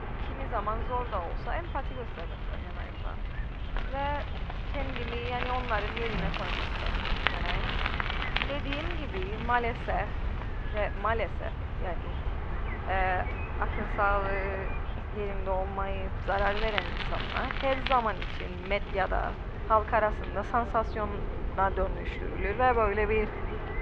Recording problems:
muffled; very; fading above 2.5 kHz
traffic noise; loud; throughout; 4 dB below the speech
train or aircraft noise; loud; throughout; 10 dB below the speech
animal sounds; faint; throughout; 25 dB below the speech

